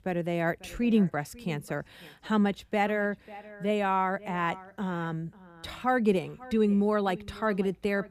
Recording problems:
echo of what is said; faint; throughout; 540 ms later, 20 dB below the speech

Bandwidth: 15 kHz